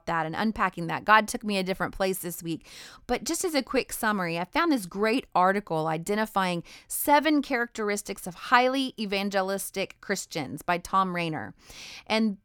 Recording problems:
none

